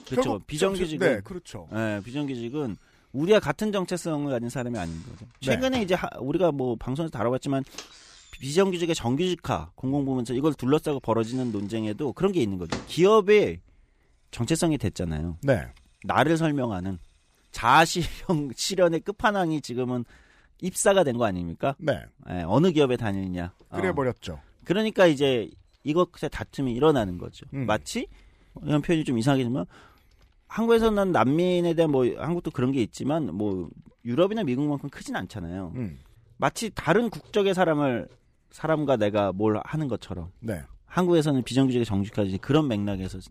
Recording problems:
household noises; faint; throughout; 20 dB below the speech

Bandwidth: 15 kHz